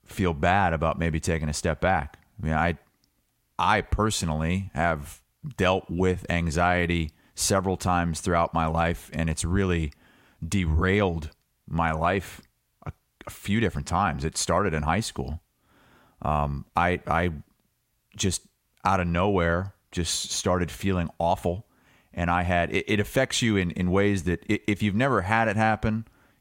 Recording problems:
none

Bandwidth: 16 kHz